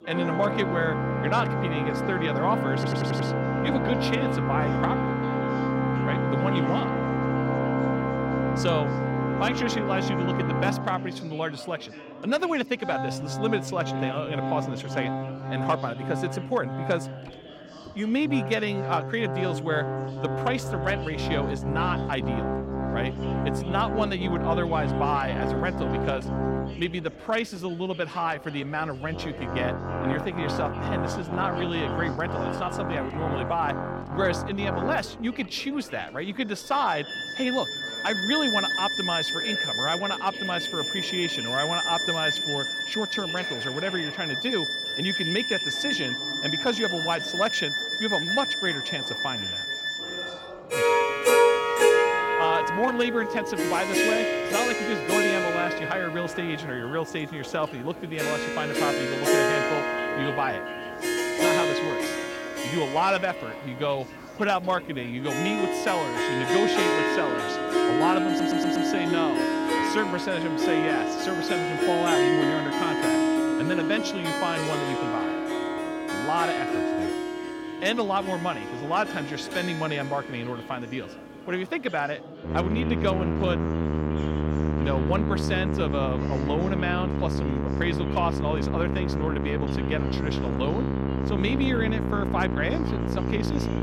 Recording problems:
background music; very loud; throughout; 2 dB above the speech
chatter from many people; noticeable; throughout; 15 dB below the speech
audio stuttering; at 3 s and at 1:08

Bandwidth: 16.5 kHz